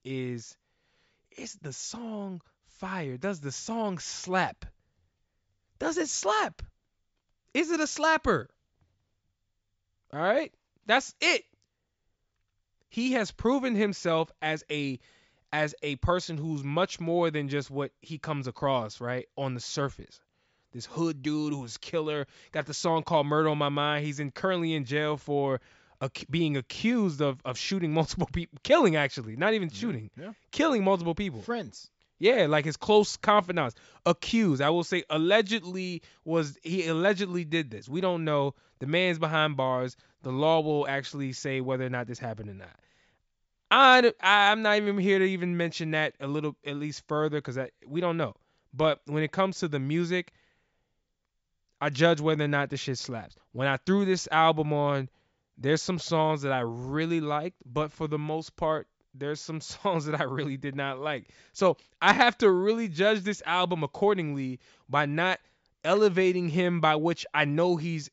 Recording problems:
high frequencies cut off; noticeable; nothing above 8 kHz

